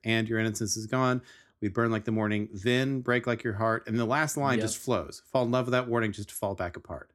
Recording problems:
none

